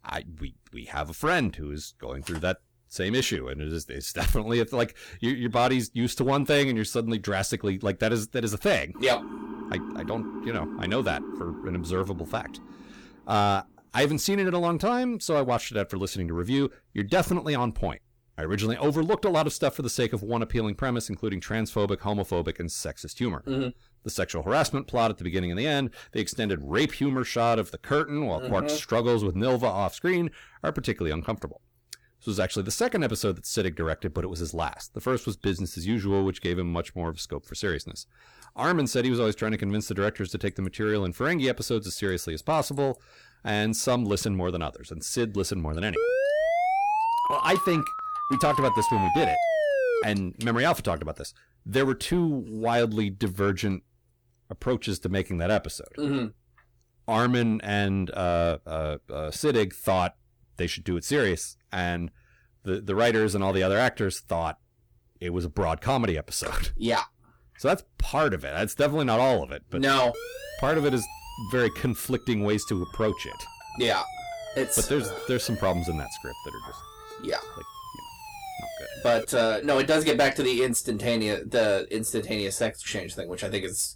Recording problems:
distortion; slight; 10 dB below the speech
siren; noticeable; from 9 to 13 s and from 1:10 to 1:19; peak 9 dB below the speech
siren; loud; from 46 to 50 s; peak 3 dB above the speech

